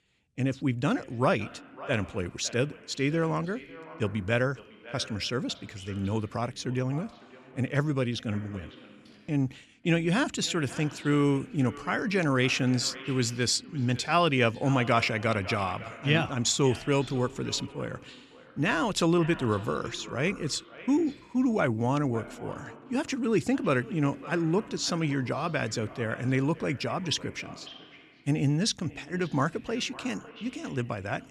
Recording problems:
echo of what is said; noticeable; throughout; 550 ms later, 15 dB below the speech

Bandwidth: 13.5 kHz